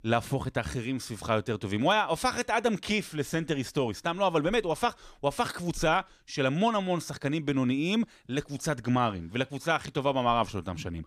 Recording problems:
none

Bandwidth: 15 kHz